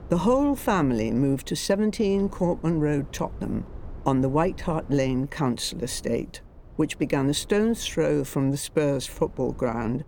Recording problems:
low rumble; faint; throughout; 25 dB below the speech

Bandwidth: 17.5 kHz